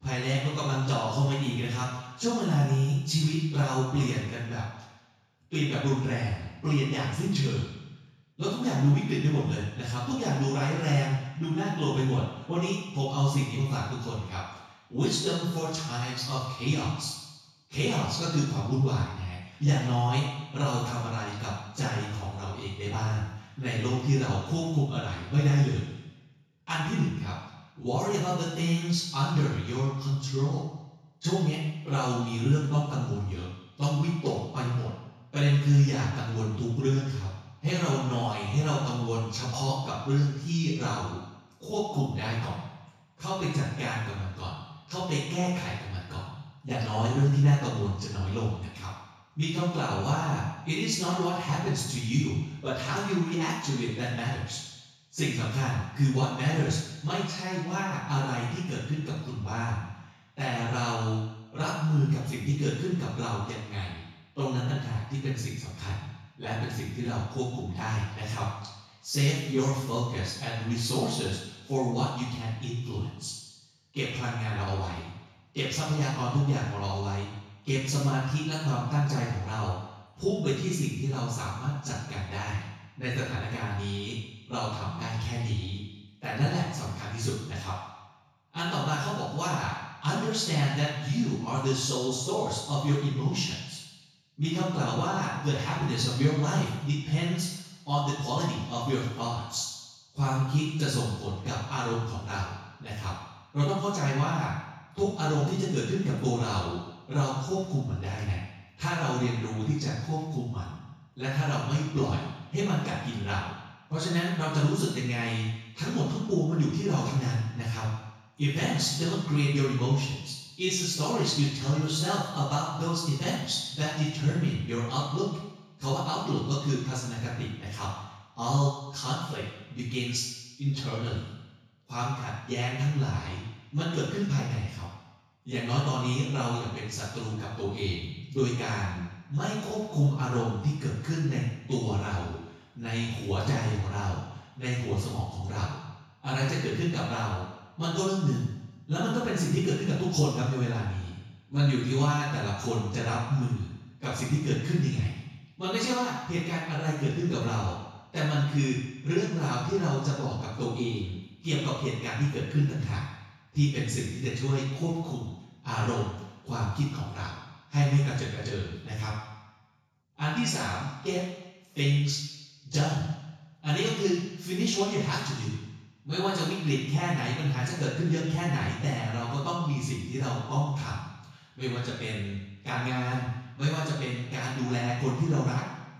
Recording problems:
off-mic speech; far
room echo; noticeable; dies away in 1 s

